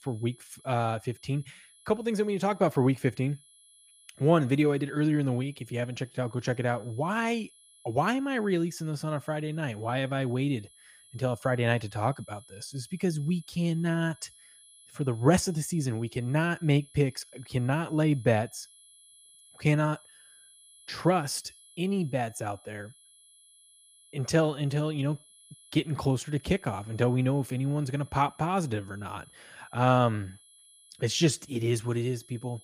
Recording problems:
high-pitched whine; faint; throughout; 11 kHz, 25 dB below the speech

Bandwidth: 15 kHz